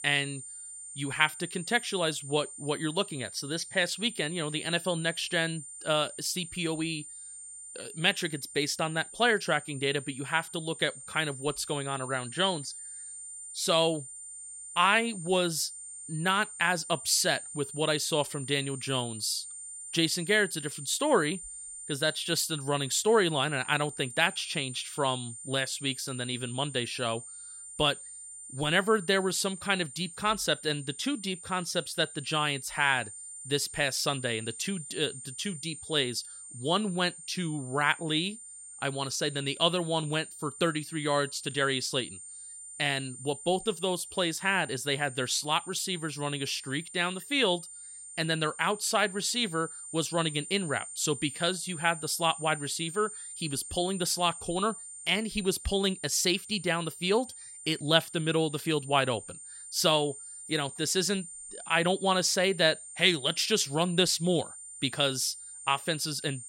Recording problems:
high-pitched whine; noticeable; throughout; 9 kHz, 10 dB below the speech

